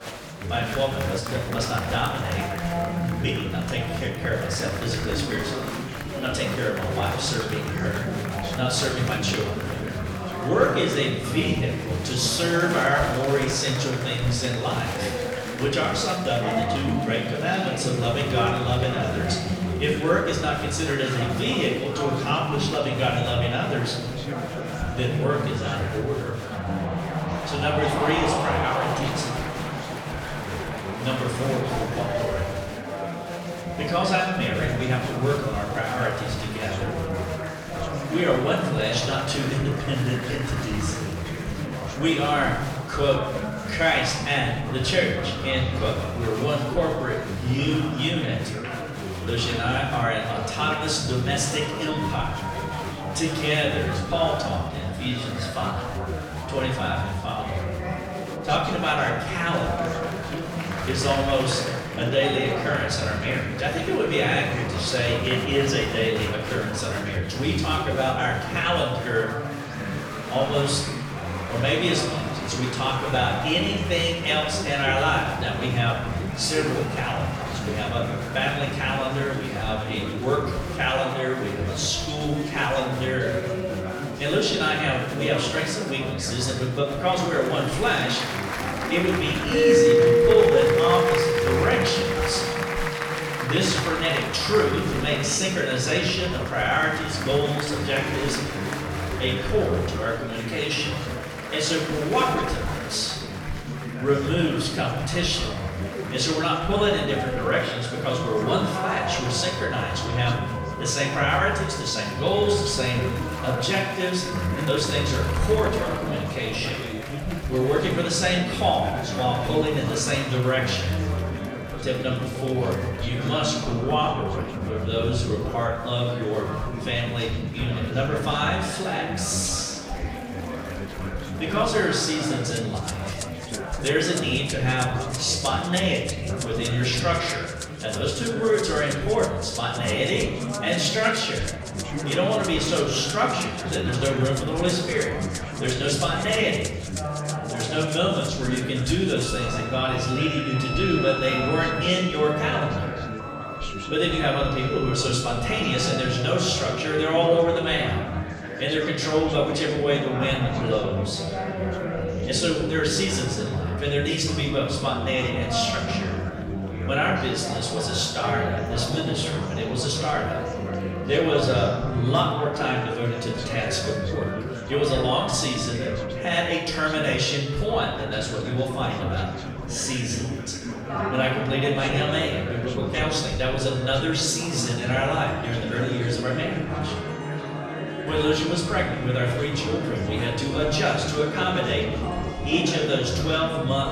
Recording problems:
off-mic speech; far
room echo; noticeable; dies away in 1 s
background music; loud; from 1:15 on; 7 dB below the speech
chatter from many people; loud; throughout; 6 dB below the speech

